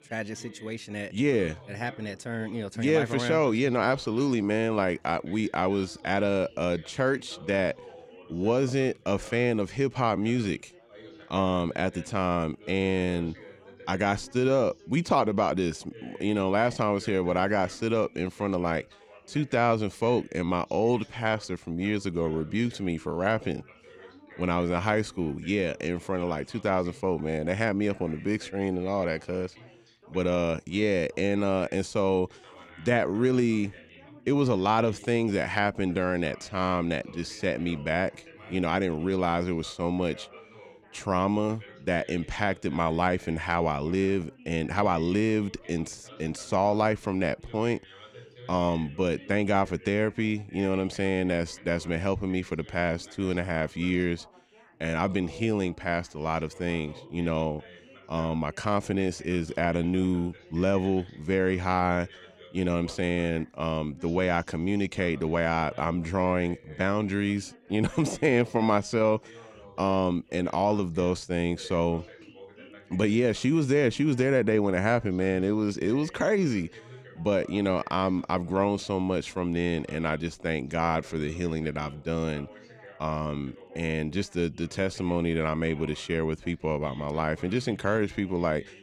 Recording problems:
background chatter; faint; throughout; 3 voices, 20 dB below the speech

